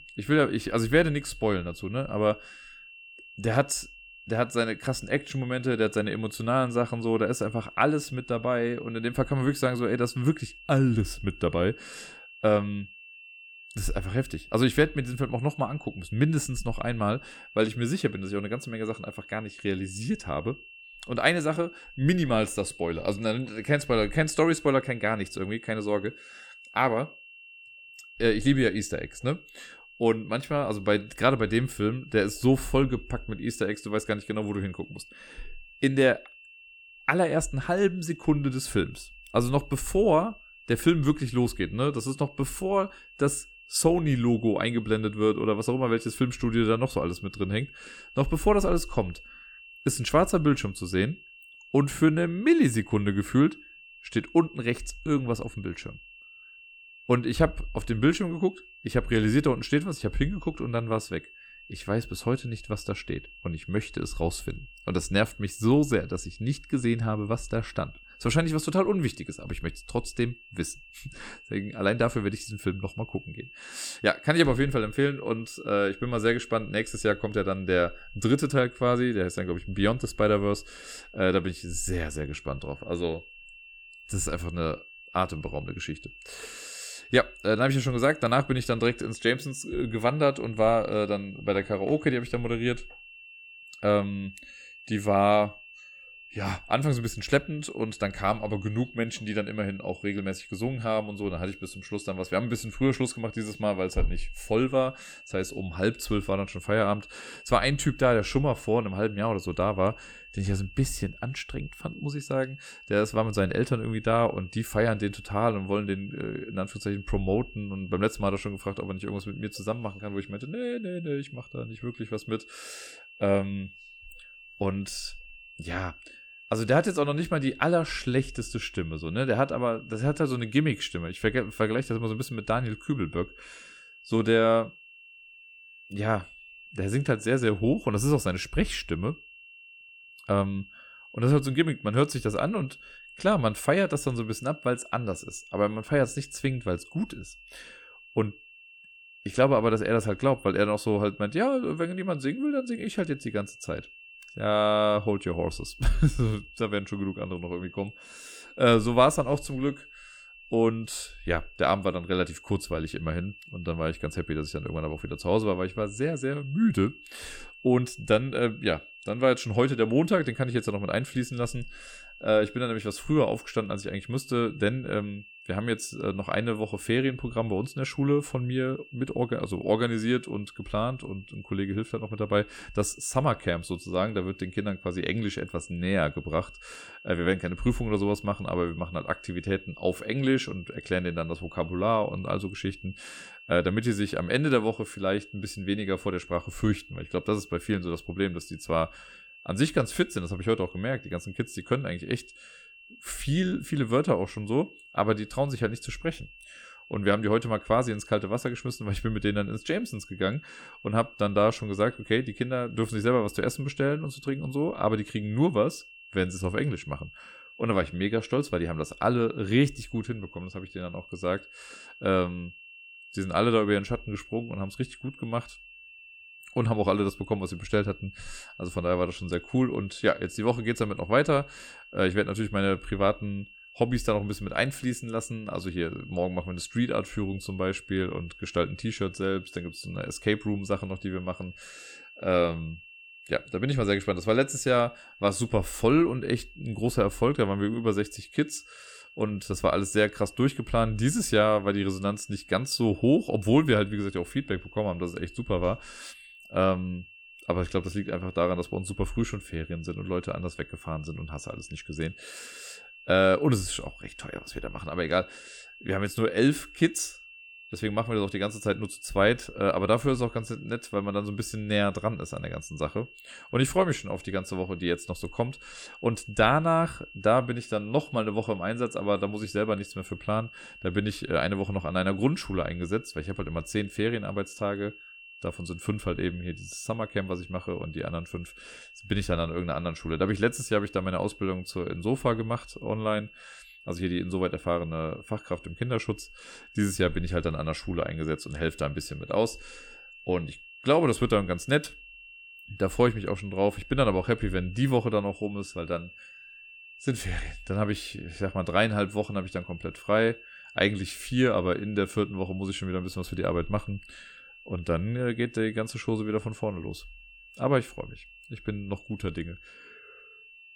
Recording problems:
high-pitched whine; noticeable; throughout; 2.5 kHz, 20 dB below the speech

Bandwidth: 17.5 kHz